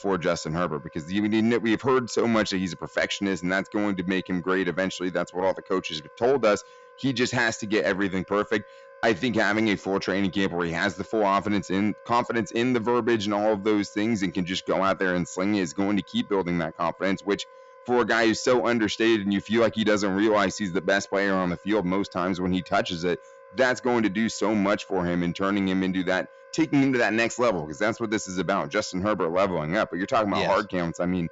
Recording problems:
high frequencies cut off; noticeable; nothing above 8 kHz
distortion; slight; 10 dB below the speech
background music; faint; throughout; 25 dB below the speech

